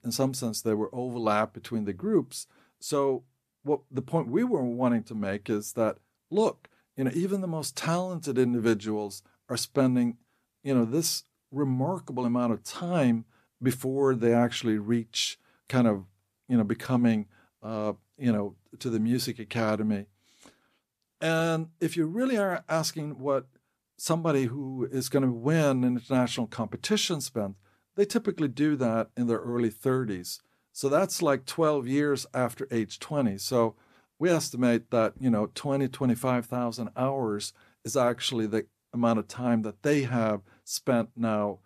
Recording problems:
none

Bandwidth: 14.5 kHz